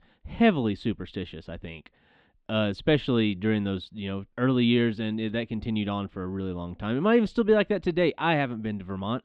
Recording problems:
muffled; slightly; fading above 3.5 kHz

